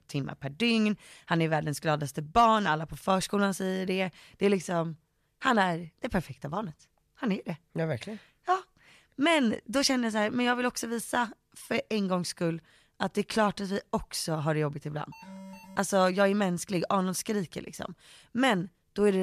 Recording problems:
alarm; faint; at 15 s; peak 15 dB below the speech
abrupt cut into speech; at the end

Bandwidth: 14.5 kHz